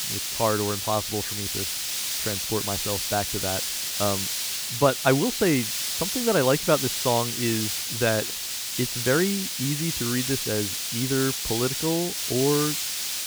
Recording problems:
high frequencies cut off; severe; nothing above 4.5 kHz
hiss; loud; throughout; as loud as the speech

